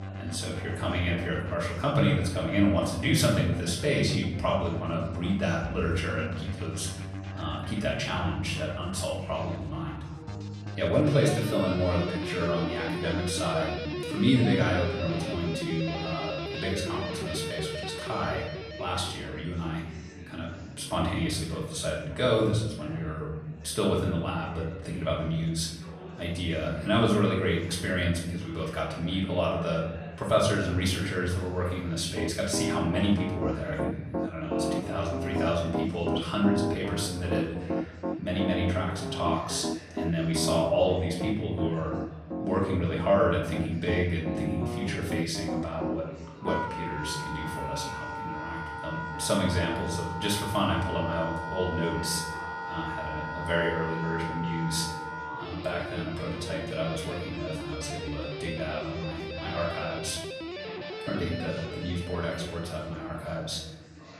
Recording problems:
off-mic speech; far
room echo; noticeable; dies away in 0.8 s
background music; loud; throughout; 6 dB below the speech
chatter from many people; noticeable; throughout; 15 dB below the speech

